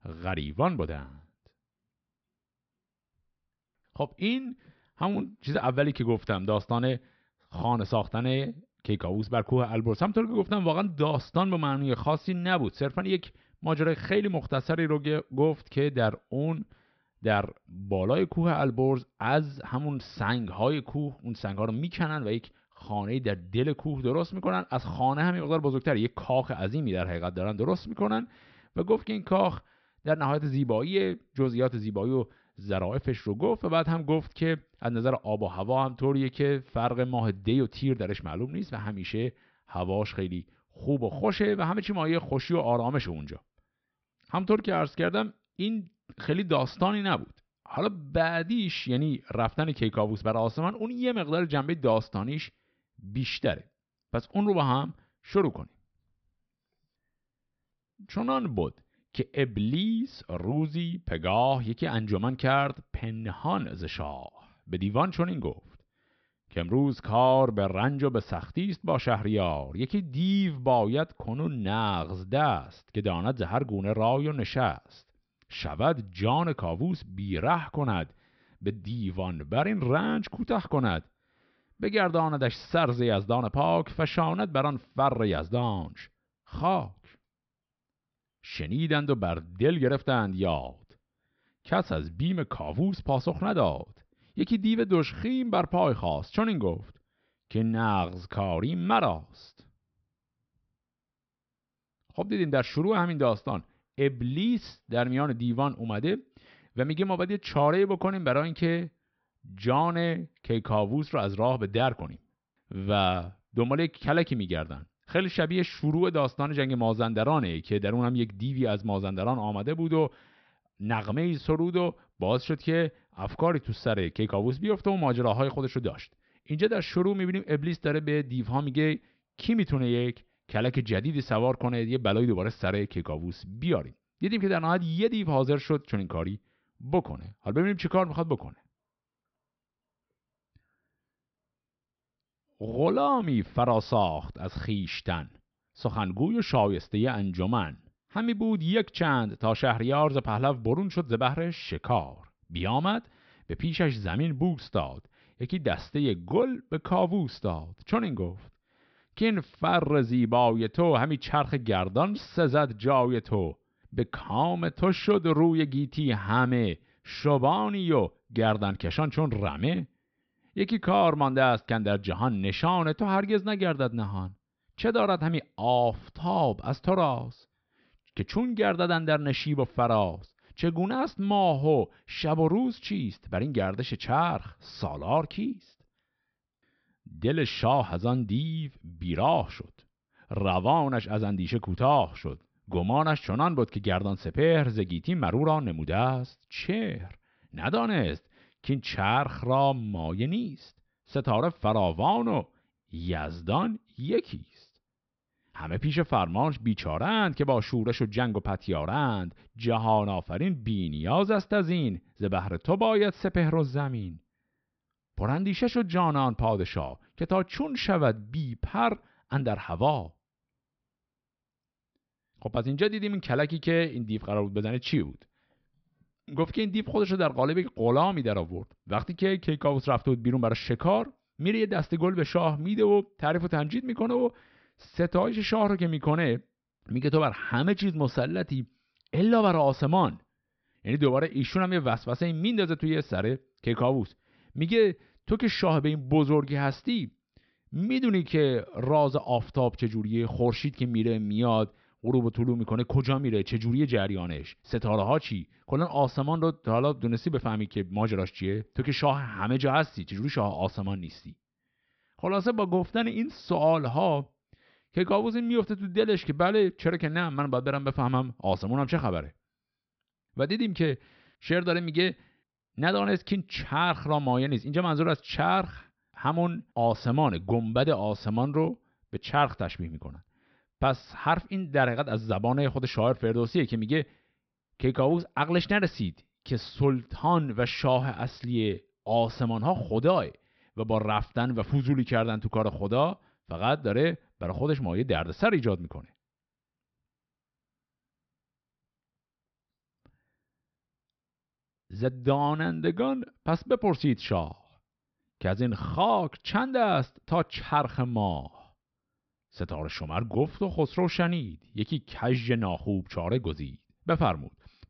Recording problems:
high frequencies cut off; noticeable; nothing above 5.5 kHz

